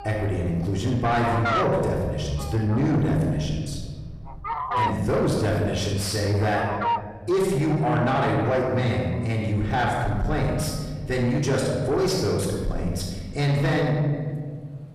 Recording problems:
off-mic speech; far
room echo; noticeable; dies away in 1.4 s
distortion; slight; 10 dB below the speech
animal sounds; loud; throughout; 4 dB below the speech

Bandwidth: 14 kHz